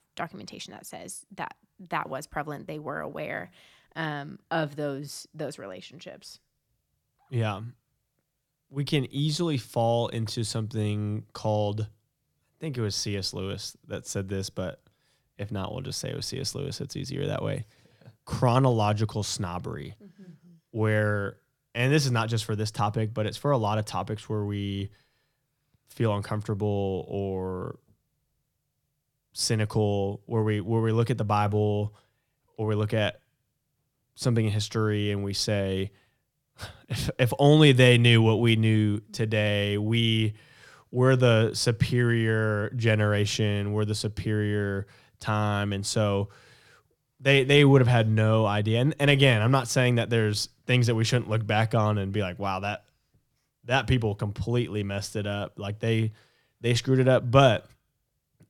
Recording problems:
none

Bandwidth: 18 kHz